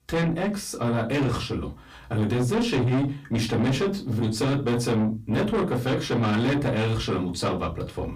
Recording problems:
distortion; heavy; 7 dB below the speech
off-mic speech; far
room echo; very slight; dies away in 0.2 s

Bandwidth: 15 kHz